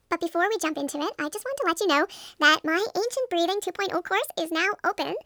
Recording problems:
wrong speed and pitch; too fast and too high; 1.5 times normal speed

